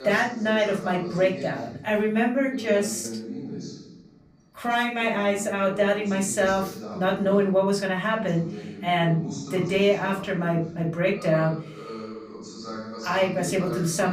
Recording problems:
off-mic speech; far
room echo; slight; dies away in 0.4 s
voice in the background; noticeable; throughout; 10 dB below the speech
choppy; occasionally; at 3 s; 1% of the speech affected
abrupt cut into speech; at the end

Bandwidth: 15.5 kHz